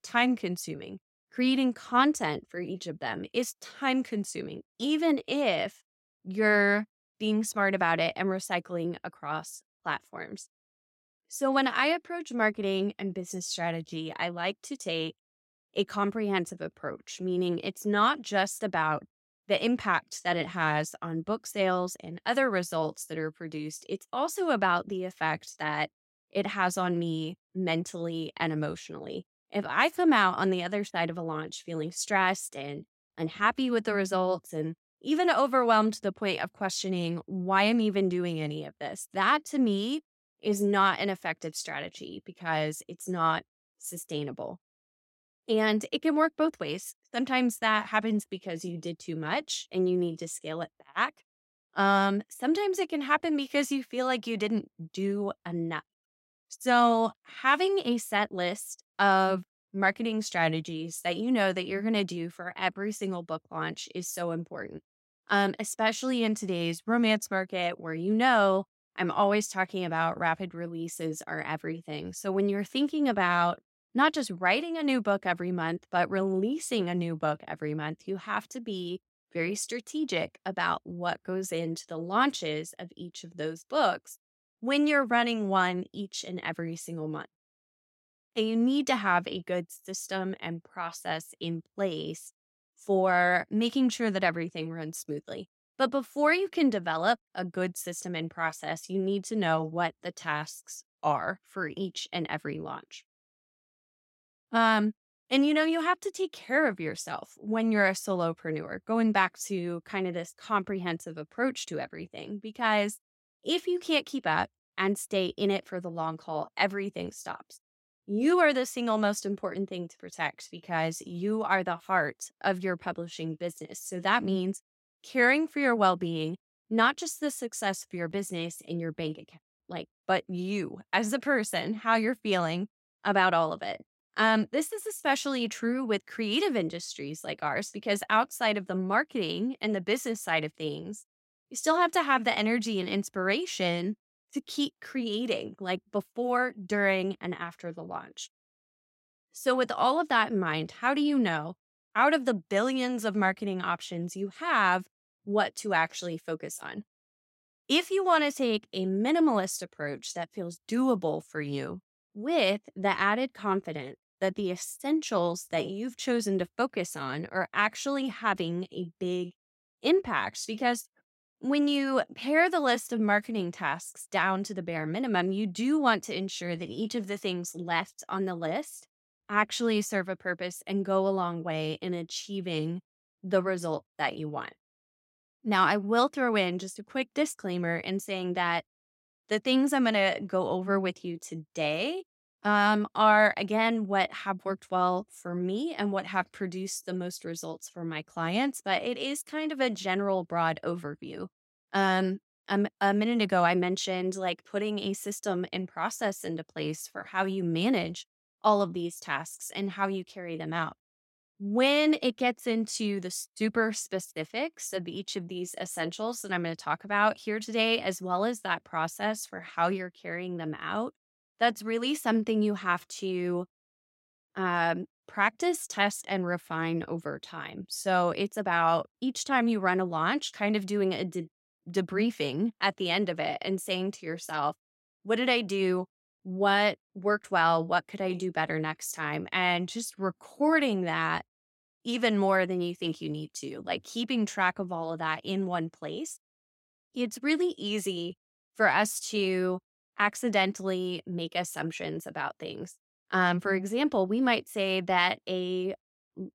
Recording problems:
none

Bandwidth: 16 kHz